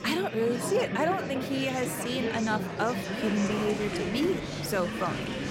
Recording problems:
murmuring crowd; loud; throughout; 3 dB below the speech

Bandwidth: 16 kHz